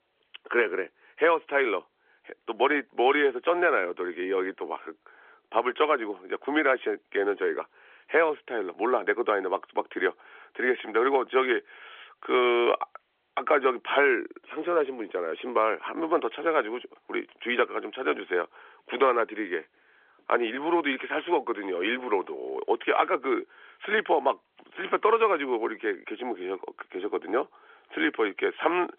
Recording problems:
phone-call audio; nothing above 3.5 kHz

